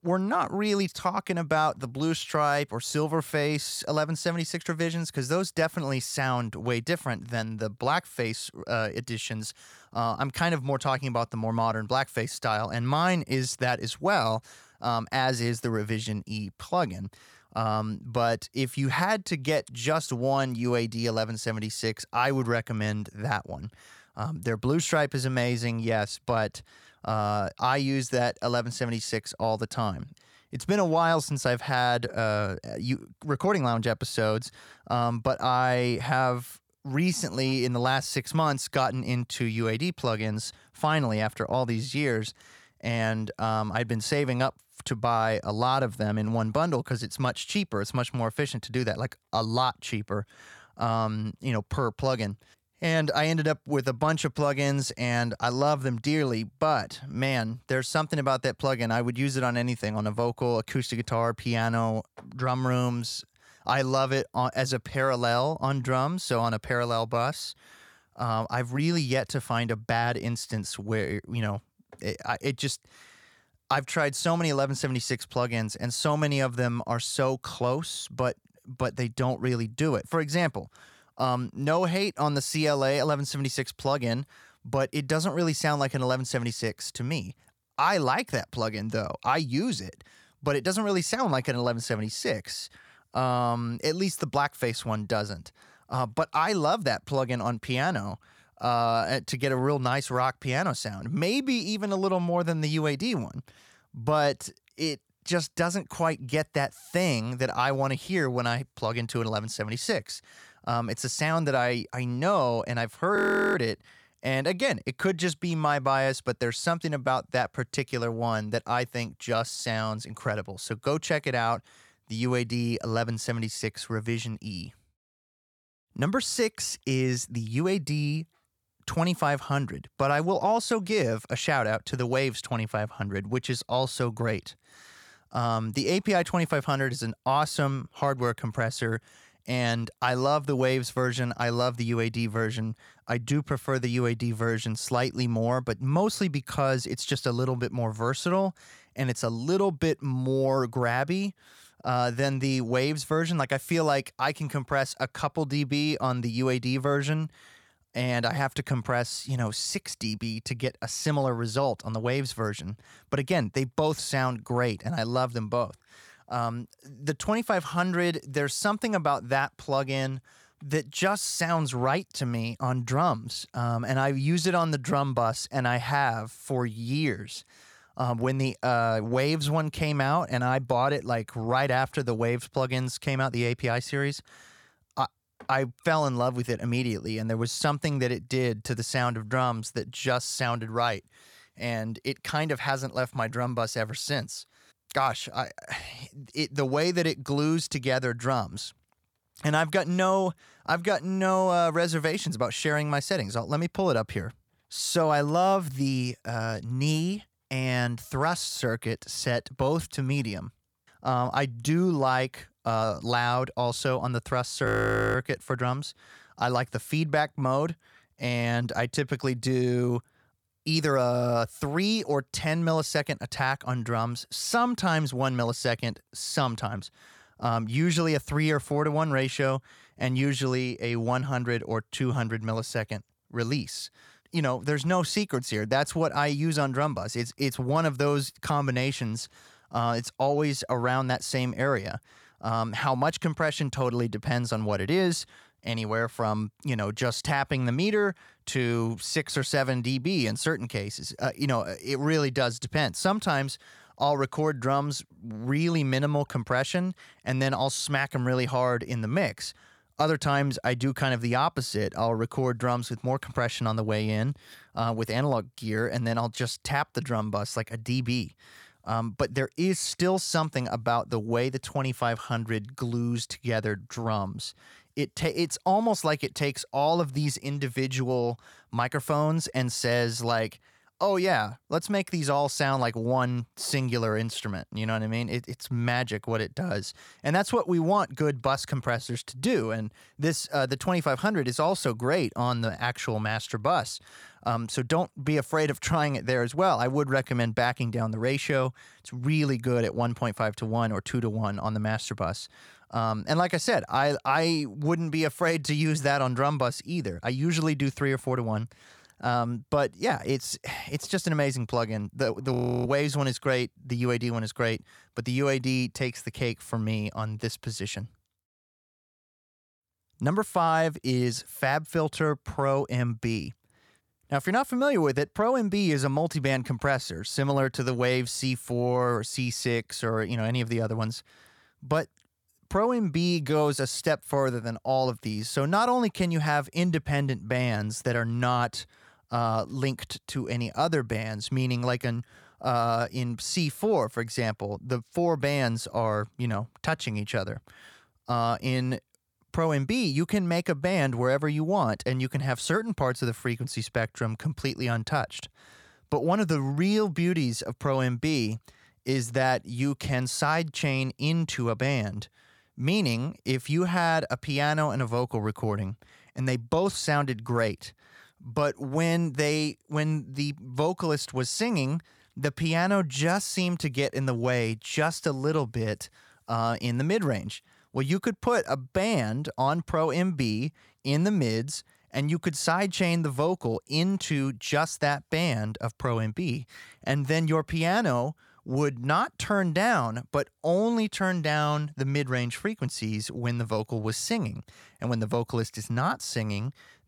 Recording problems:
audio freezing; at 1:53, at 3:35 and at 5:13

